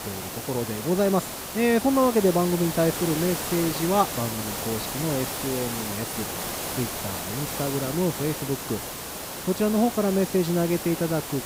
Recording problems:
hiss; loud; throughout; 5 dB below the speech

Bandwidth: 15.5 kHz